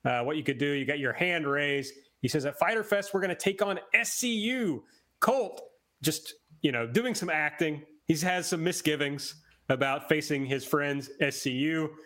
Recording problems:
squashed, flat; somewhat

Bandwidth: 16 kHz